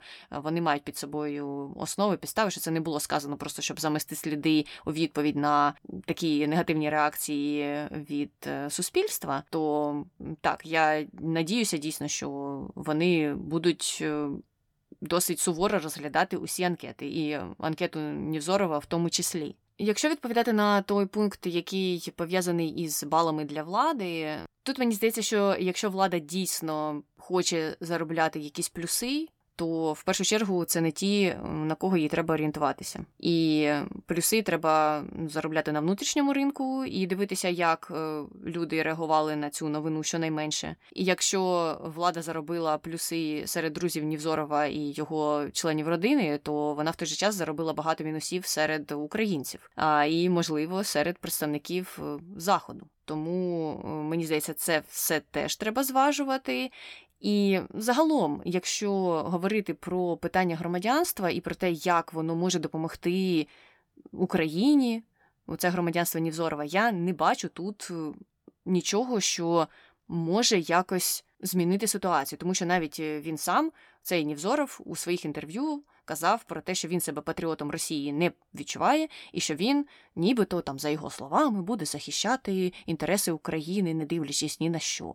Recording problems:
none

